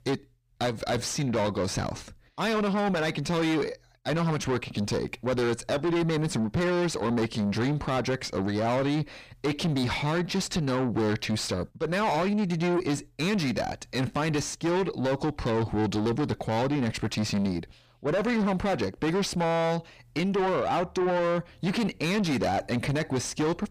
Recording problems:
distortion; heavy; 6 dB below the speech

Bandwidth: 15 kHz